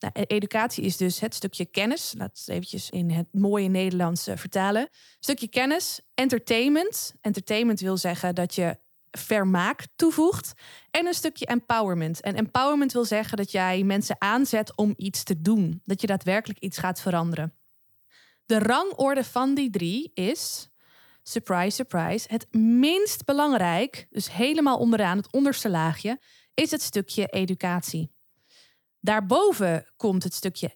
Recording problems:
none

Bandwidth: 18.5 kHz